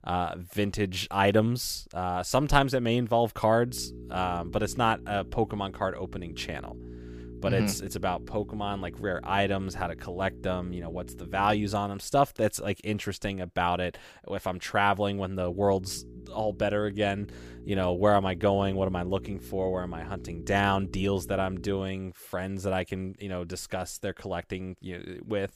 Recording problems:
electrical hum; faint; from 3.5 to 12 s and from 15 to 22 s; 60 Hz, 20 dB below the speech

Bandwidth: 15 kHz